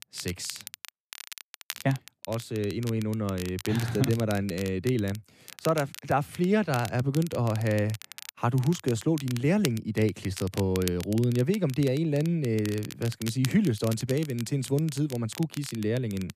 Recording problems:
crackle, like an old record; noticeable; 15 dB below the speech

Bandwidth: 14.5 kHz